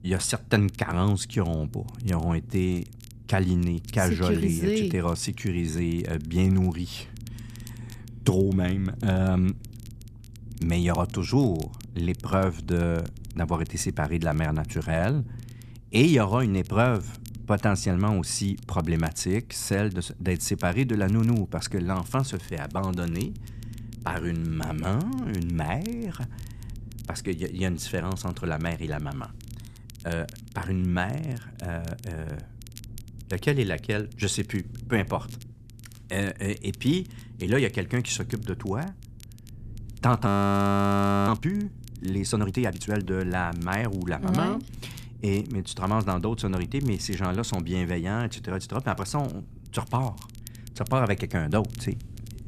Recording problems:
low rumble; faint; throughout; 25 dB below the speech
crackle, like an old record; faint; 25 dB below the speech
audio freezing; at 40 s for 1 s

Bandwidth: 14 kHz